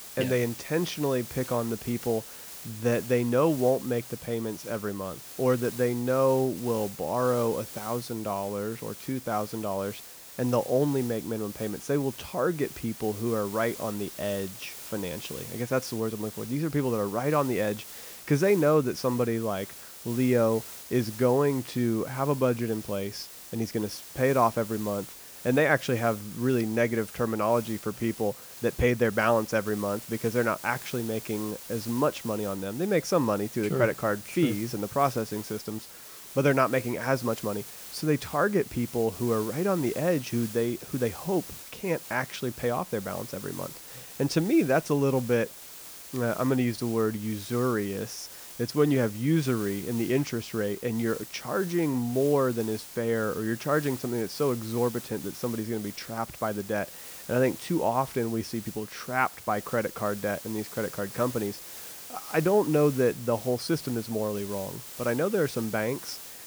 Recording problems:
hiss; noticeable; throughout; 15 dB below the speech

